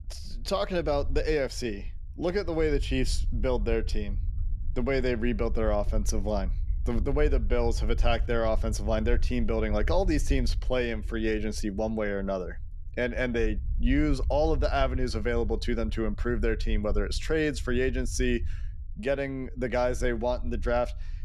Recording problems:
low rumble; faint; throughout; 25 dB below the speech

